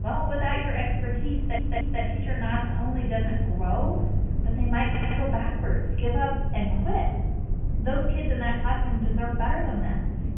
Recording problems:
off-mic speech; far
high frequencies cut off; severe; nothing above 3 kHz
room echo; noticeable; dies away in 0.9 s
low rumble; noticeable; throughout; 10 dB below the speech
chatter from many people; faint; throughout; 25 dB below the speech
audio stuttering; at 1.5 s and at 5 s

